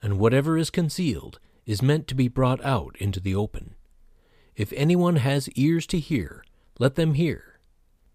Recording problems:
none

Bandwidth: 15 kHz